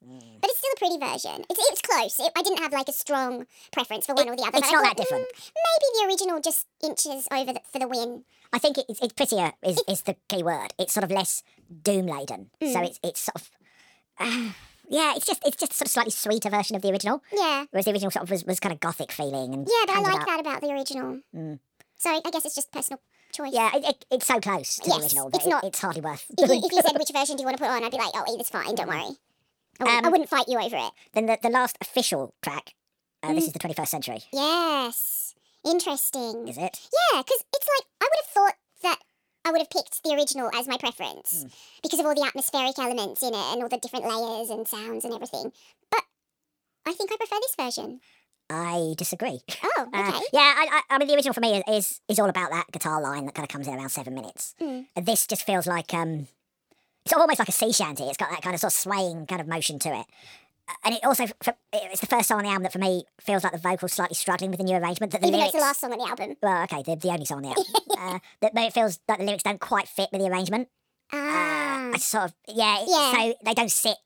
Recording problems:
wrong speed and pitch; too fast and too high; 1.6 times normal speed

